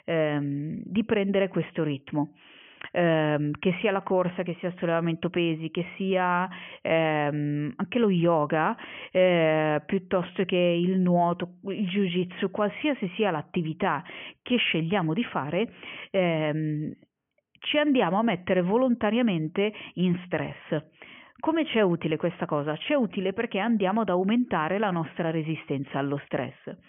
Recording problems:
high frequencies cut off; severe; nothing above 3 kHz

